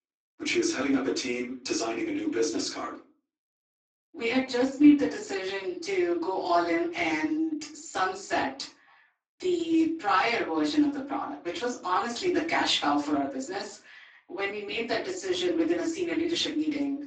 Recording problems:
off-mic speech; far
garbled, watery; badly; nothing above 7.5 kHz
room echo; slight; dies away in 0.3 s
thin; very slightly; fading below 250 Hz

